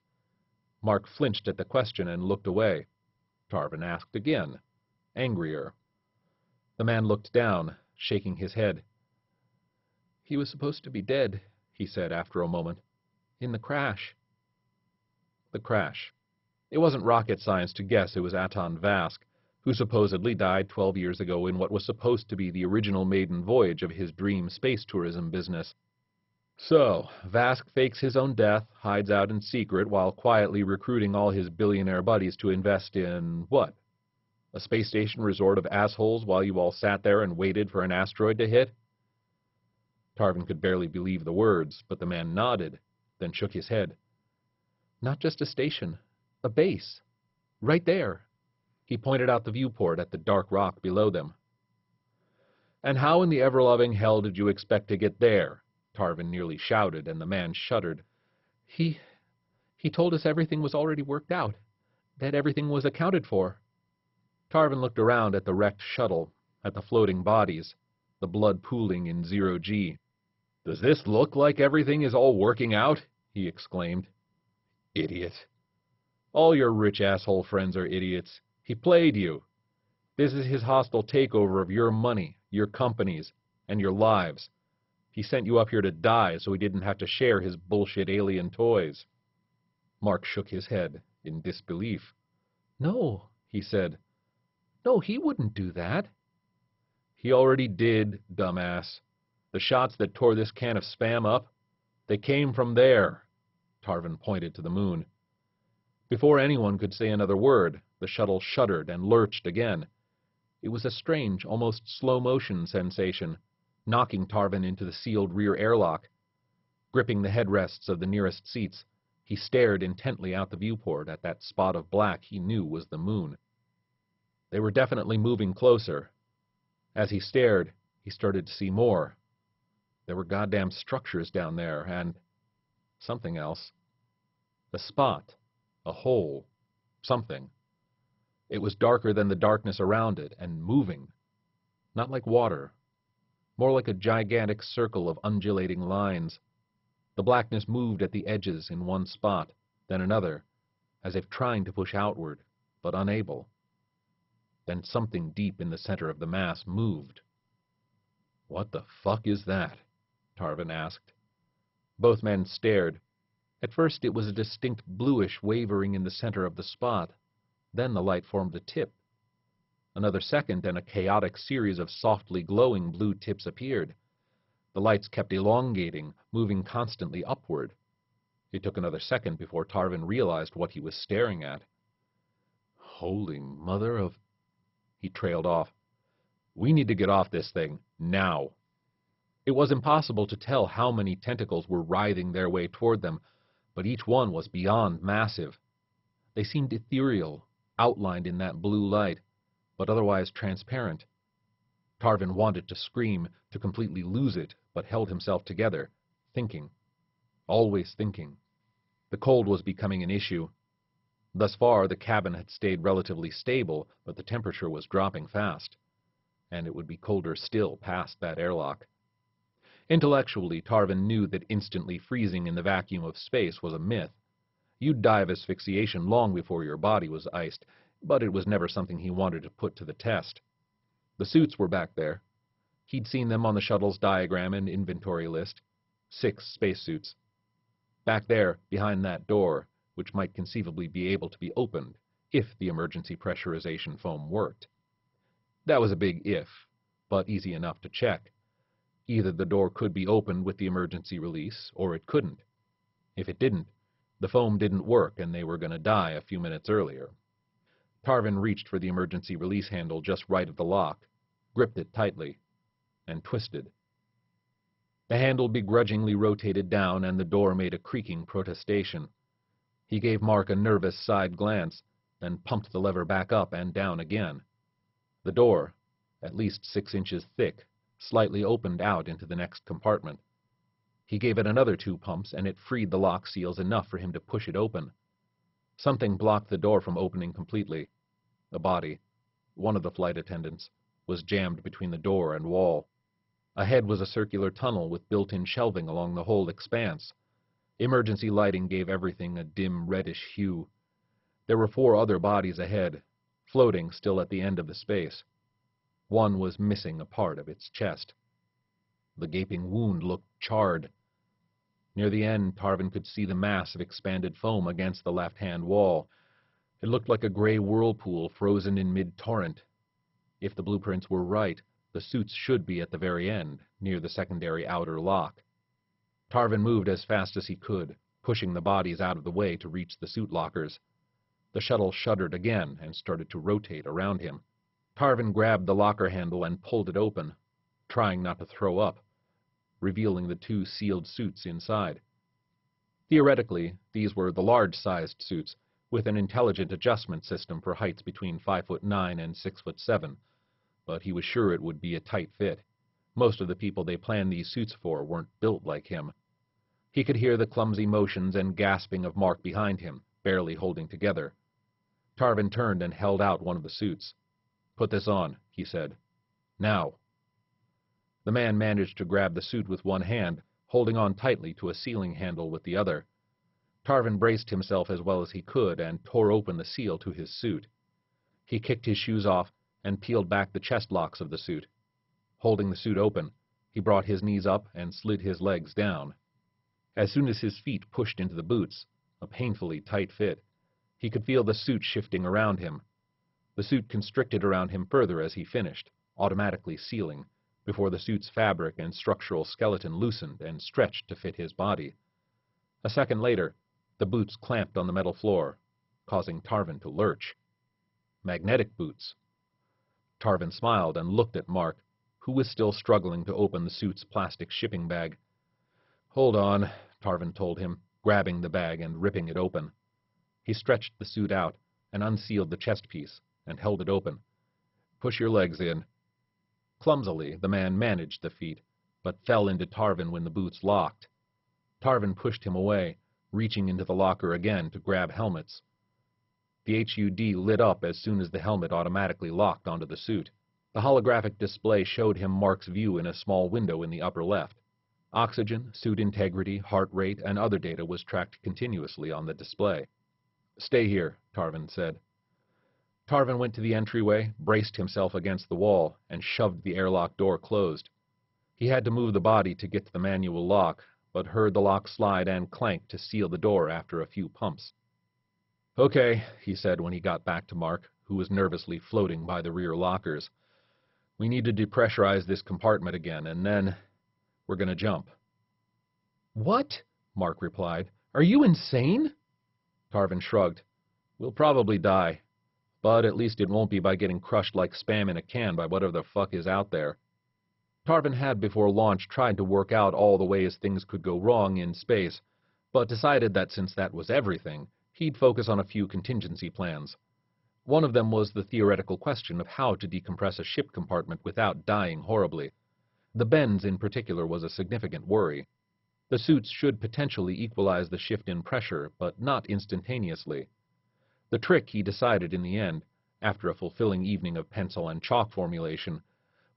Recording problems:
garbled, watery; badly; nothing above 5.5 kHz

